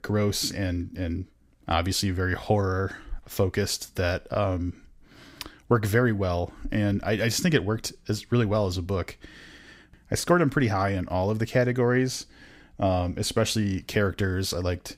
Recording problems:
none

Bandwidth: 15.5 kHz